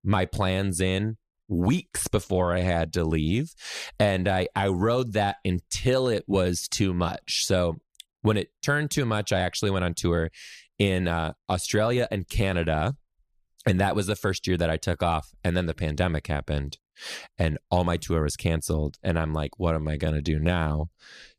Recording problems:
none

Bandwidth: 14.5 kHz